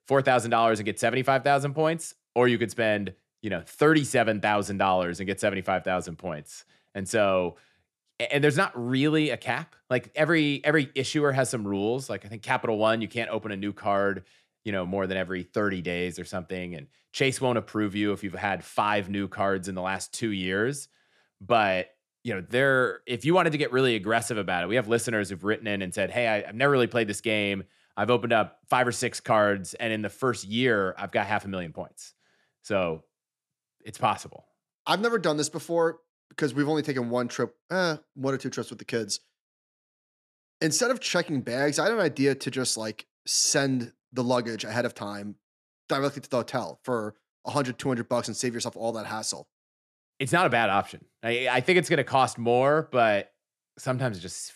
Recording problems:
none

